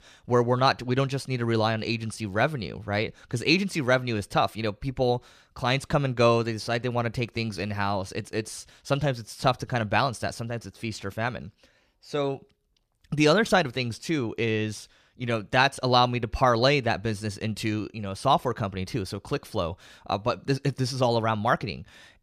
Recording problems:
none

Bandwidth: 14.5 kHz